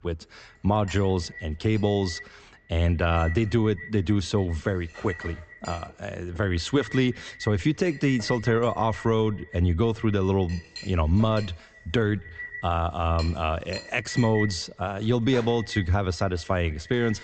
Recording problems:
echo of what is said; noticeable; throughout; 140 ms later, 15 dB below the speech
high frequencies cut off; noticeable; nothing above 8 kHz
household noises; noticeable; throughout; 20 dB below the speech

